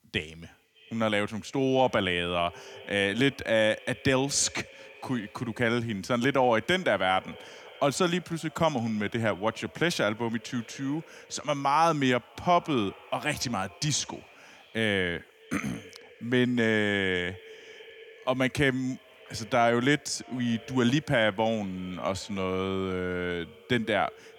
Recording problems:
echo of what is said; faint; throughout; 300 ms later, 20 dB below the speech

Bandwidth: 18.5 kHz